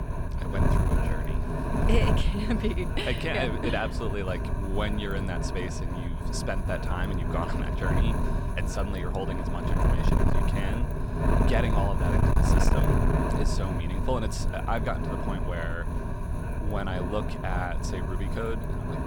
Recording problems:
wind noise on the microphone; heavy; 1 dB below the speech

